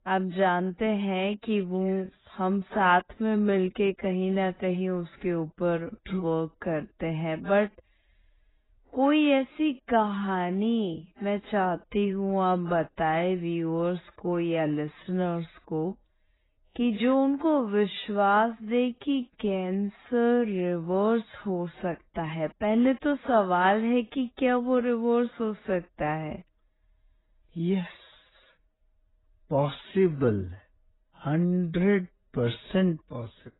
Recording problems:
garbled, watery; badly; nothing above 4 kHz
wrong speed, natural pitch; too slow; 0.6 times normal speed

